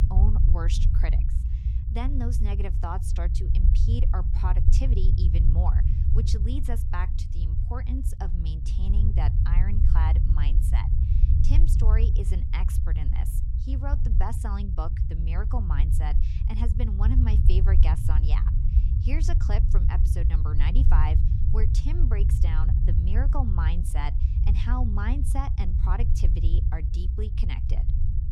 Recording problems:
low rumble; loud; throughout; 4 dB below the speech

